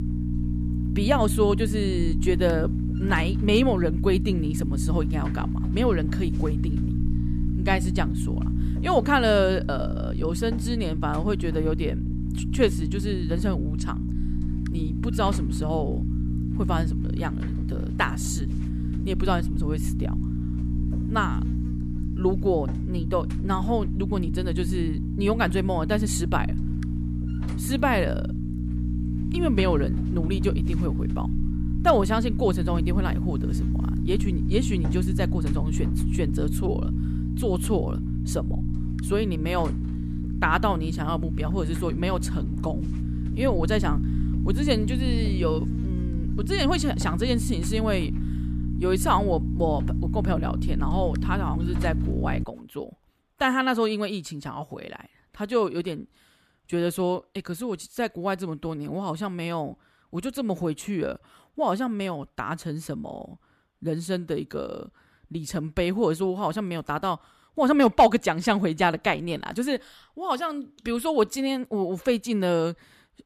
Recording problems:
electrical hum; loud; until 52 s; 60 Hz, 10 dB below the speech

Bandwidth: 14.5 kHz